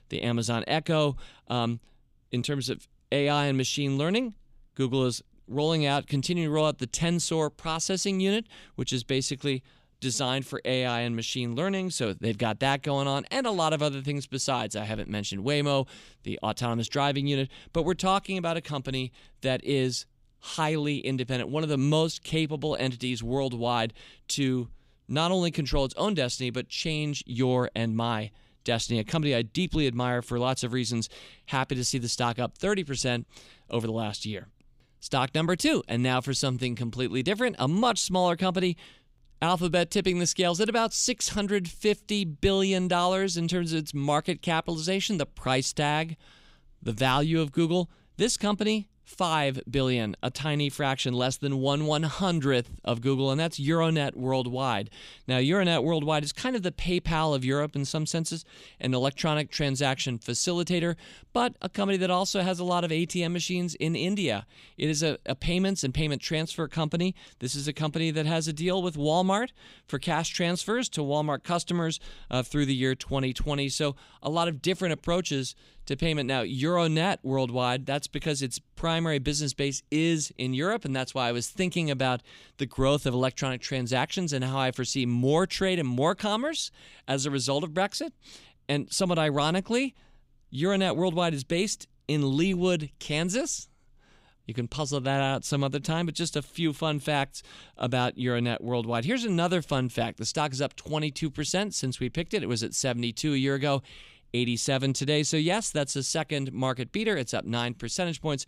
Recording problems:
none

